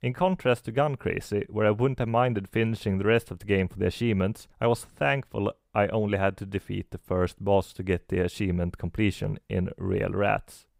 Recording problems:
none

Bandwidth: 15.5 kHz